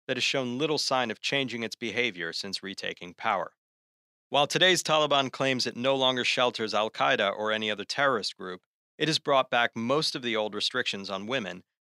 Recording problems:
thin; very slightly; fading below 500 Hz

